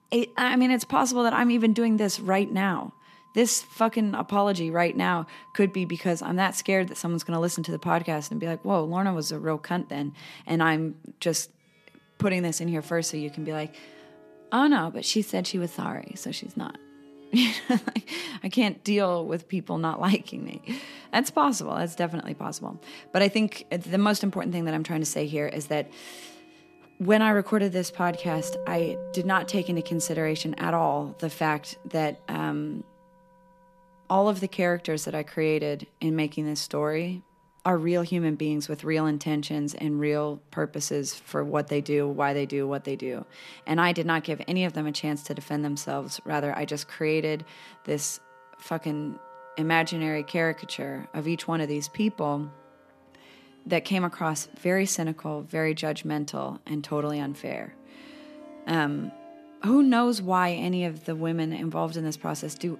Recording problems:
background music; faint; throughout; 20 dB below the speech

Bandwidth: 14.5 kHz